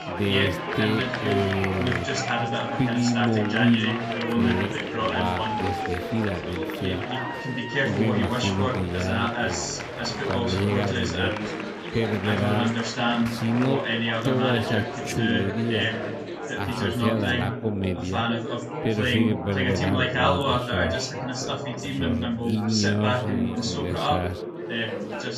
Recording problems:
wrong speed, natural pitch; too slow; 0.6 times normal speed
chatter from many people; very loud; throughout; 2 dB above the speech

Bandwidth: 15.5 kHz